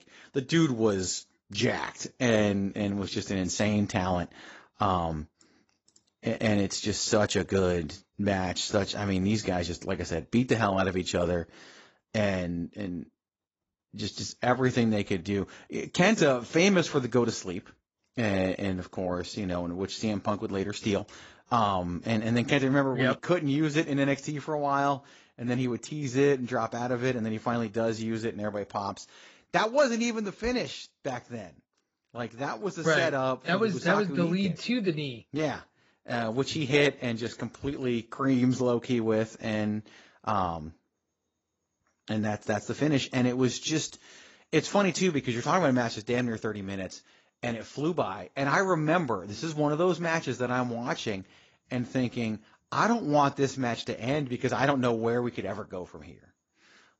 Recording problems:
garbled, watery; badly; nothing above 7.5 kHz

